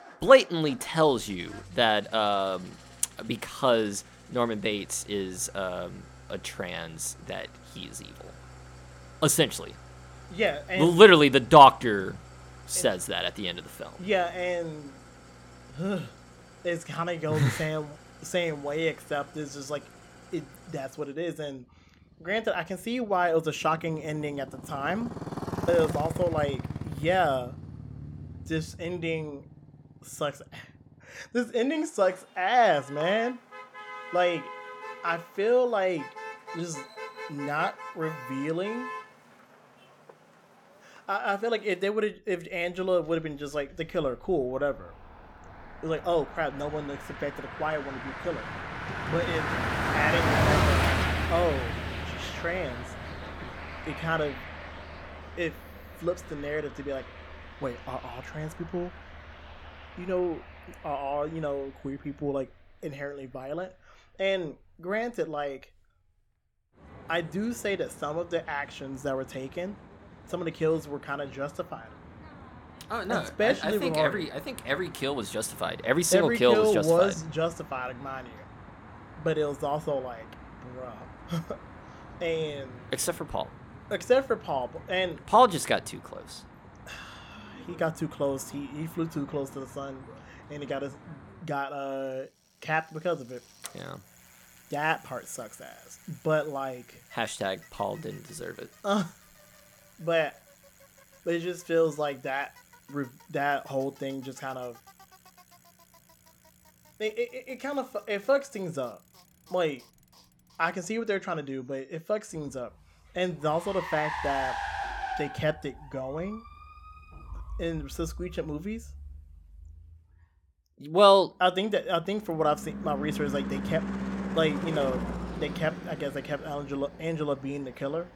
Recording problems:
traffic noise; loud; throughout; 10 dB below the speech

